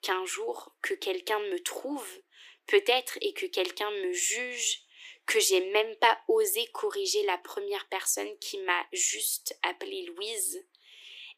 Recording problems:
thin; very; fading below 300 Hz

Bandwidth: 15 kHz